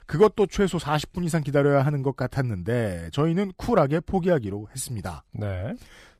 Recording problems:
none

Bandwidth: 14.5 kHz